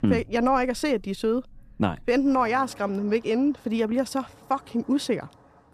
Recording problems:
traffic noise; faint; throughout; 25 dB below the speech

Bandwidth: 14.5 kHz